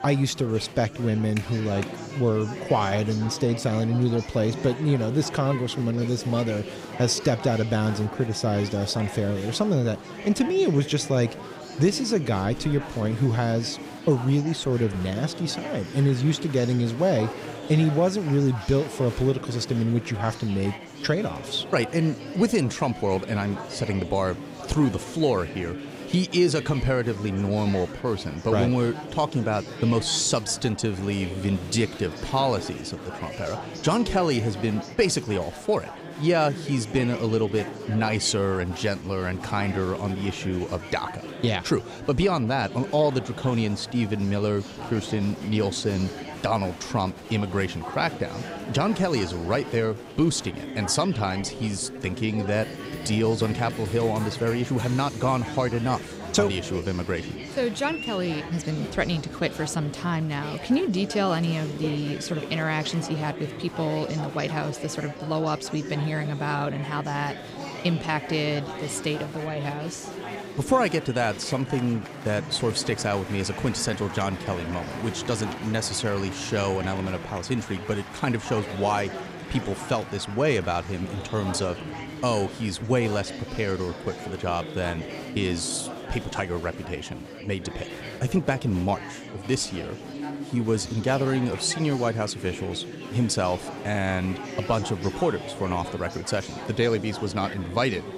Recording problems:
chatter from many people; noticeable; throughout; 10 dB below the speech

